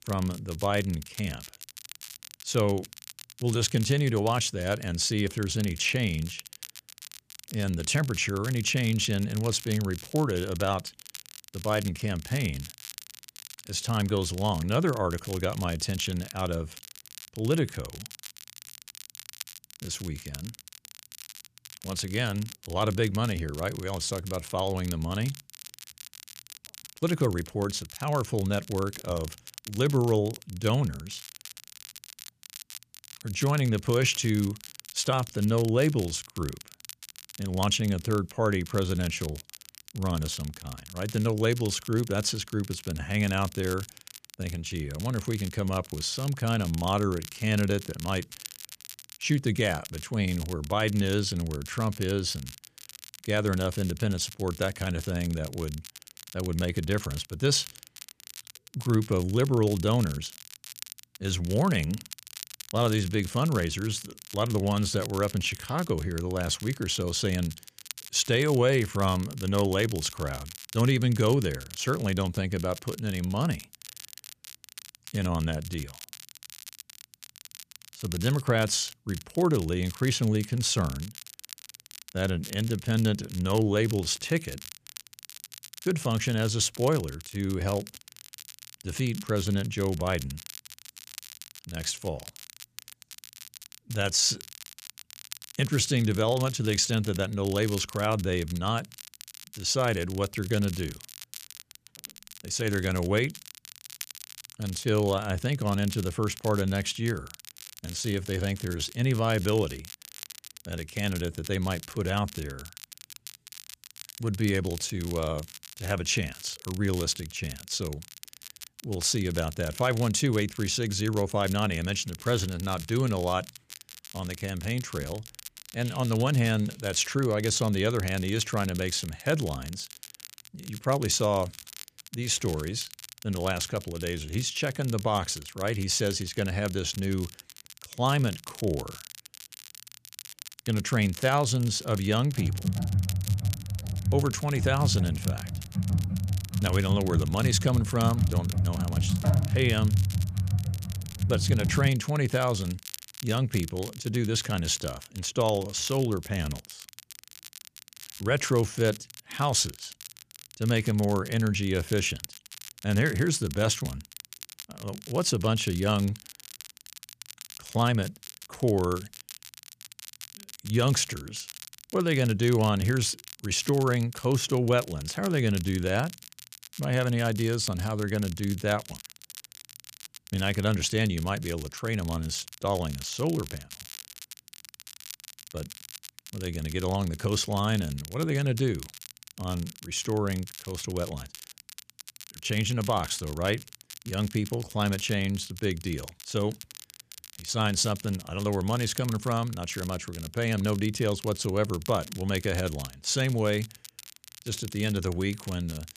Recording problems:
crackle, like an old record; noticeable; 15 dB below the speech
keyboard typing; loud; from 2:22 to 2:32; peak 3 dB above the speech

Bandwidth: 14.5 kHz